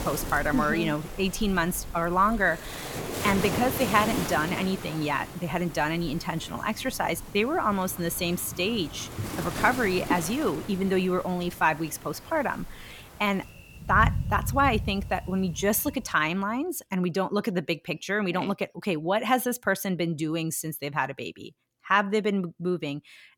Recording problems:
rain or running water; loud; until 16 s; 9 dB below the speech

